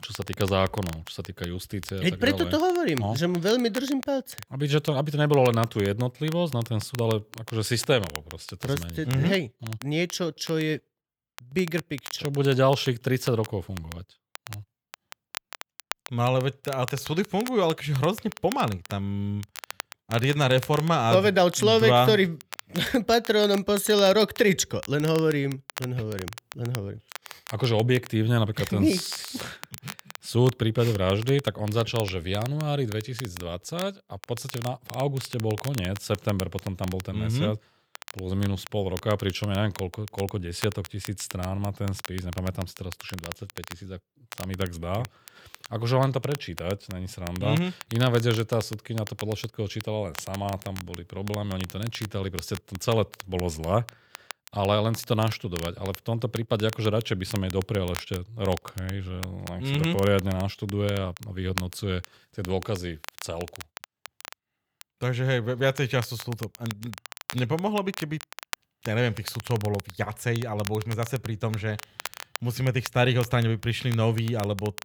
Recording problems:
crackle, like an old record; noticeable; 15 dB below the speech

